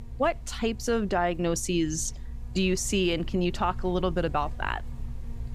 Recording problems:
electrical hum; very faint; throughout; 50 Hz, 25 dB below the speech

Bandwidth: 15.5 kHz